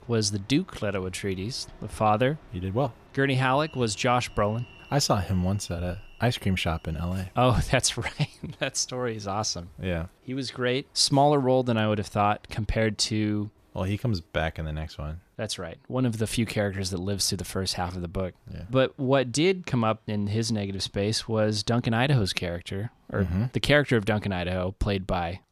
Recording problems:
train or aircraft noise; faint; throughout; 25 dB below the speech

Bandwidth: 14.5 kHz